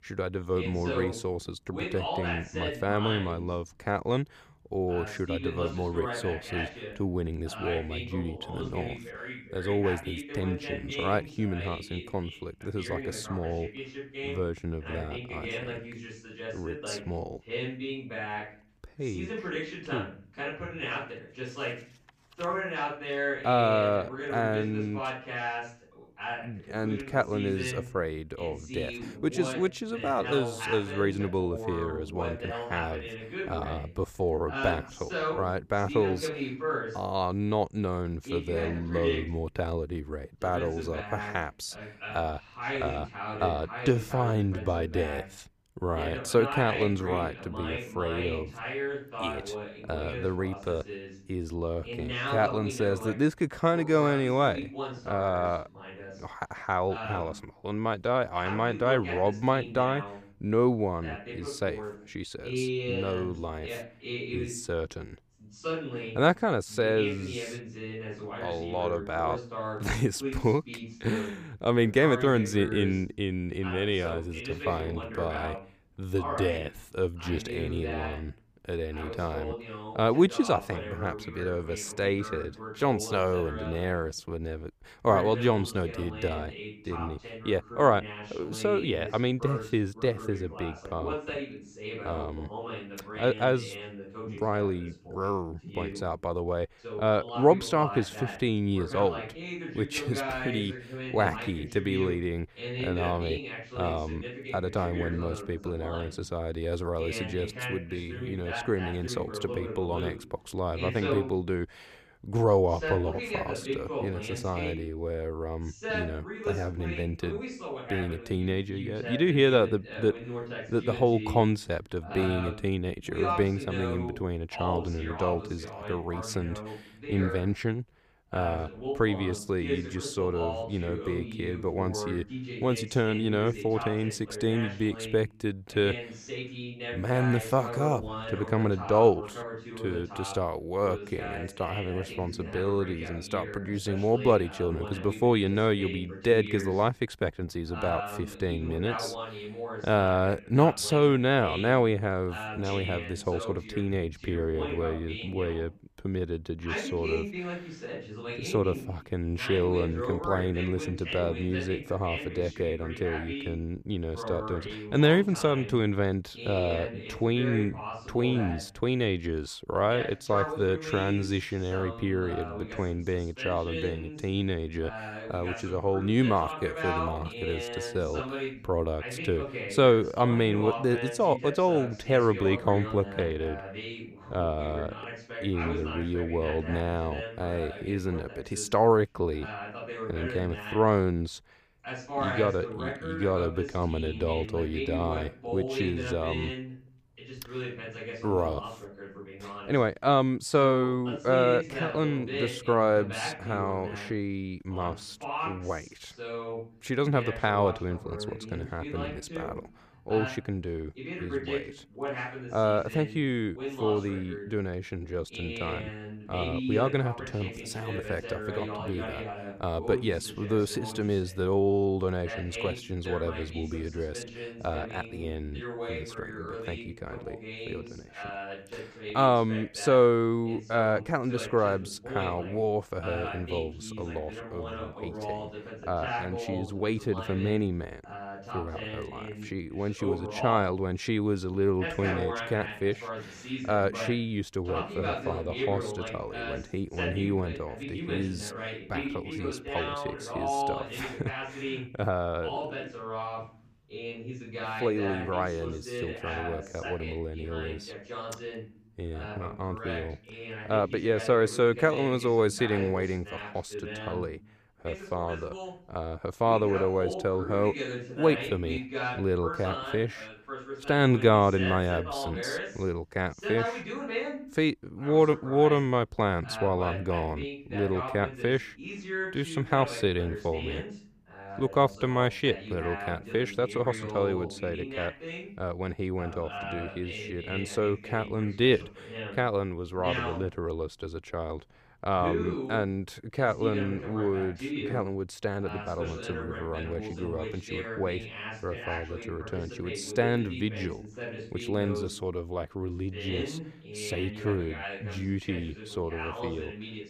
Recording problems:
voice in the background; loud; throughout; 8 dB below the speech

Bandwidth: 15 kHz